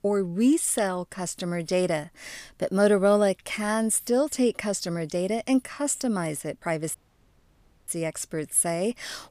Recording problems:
audio cutting out; at 7 s for 1 s

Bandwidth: 15 kHz